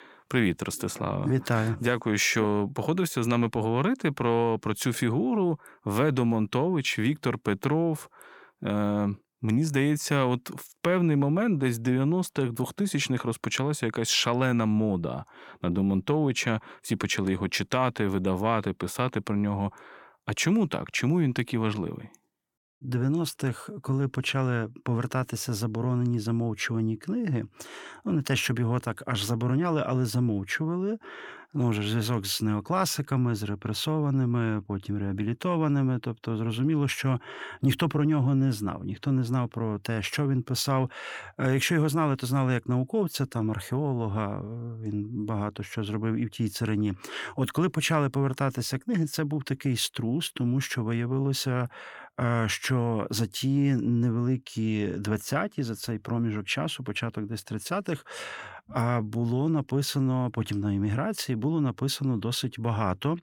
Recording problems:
none

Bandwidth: 18 kHz